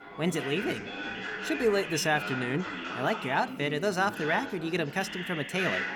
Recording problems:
chatter from many people; loud; throughout; 6 dB below the speech

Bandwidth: 19 kHz